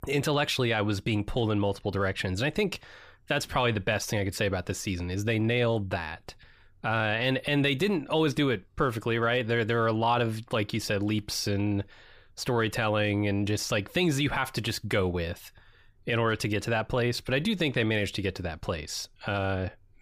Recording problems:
none

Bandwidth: 15 kHz